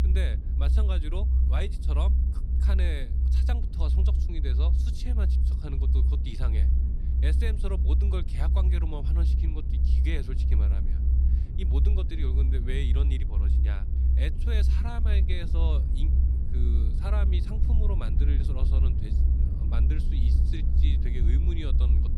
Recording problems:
low rumble; loud; throughout; 2 dB below the speech

